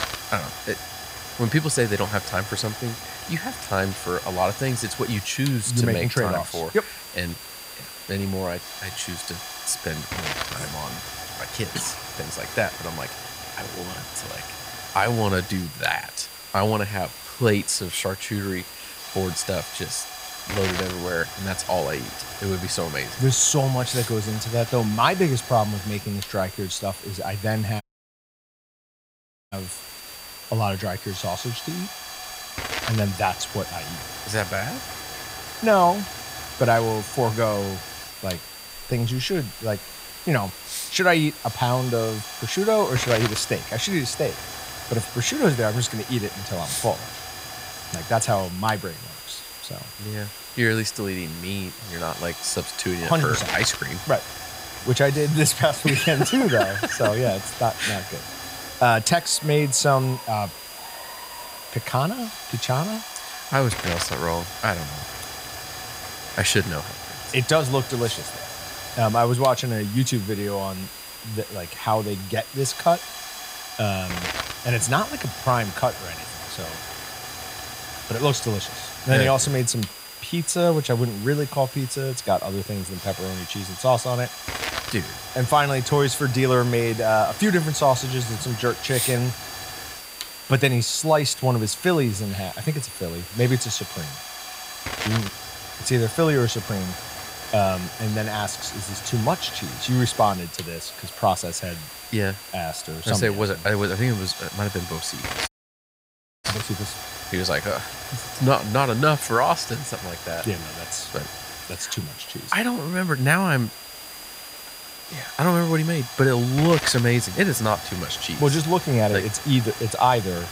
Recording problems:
high-pitched whine; noticeable; throughout; 5 kHz, 20 dB below the speech
hiss; noticeable; throughout; 10 dB below the speech
crowd noise; faint; throughout; 30 dB below the speech
audio cutting out; at 28 s for 1.5 s and at 1:45 for 1 s

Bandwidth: 15.5 kHz